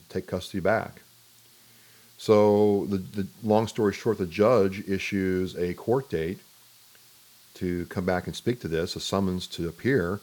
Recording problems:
hiss; faint; throughout; 25 dB below the speech

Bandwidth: 18.5 kHz